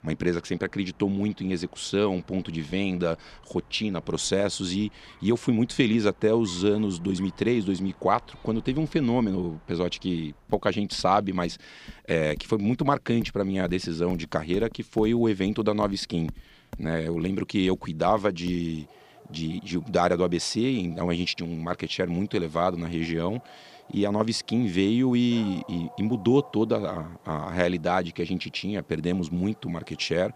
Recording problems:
animal sounds; faint; throughout; 25 dB below the speech

